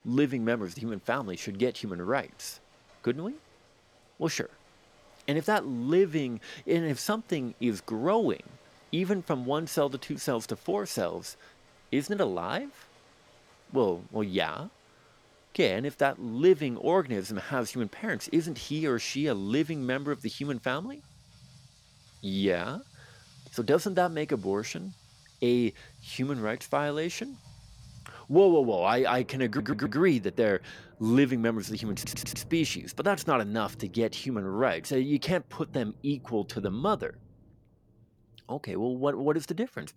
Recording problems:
rain or running water; faint; throughout; 25 dB below the speech
audio stuttering; at 29 s and at 32 s

